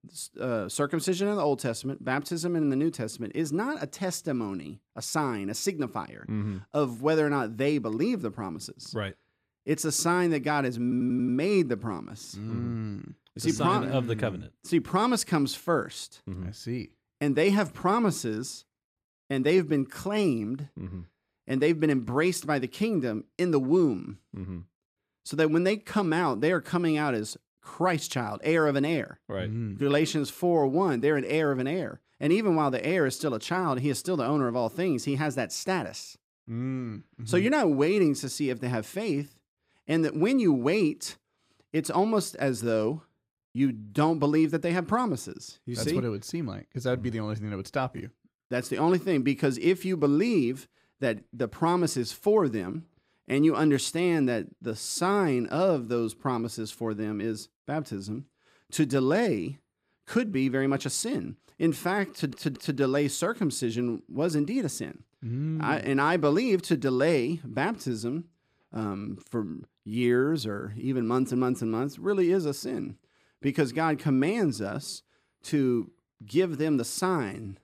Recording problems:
audio stuttering; at 11 s and at 1:02

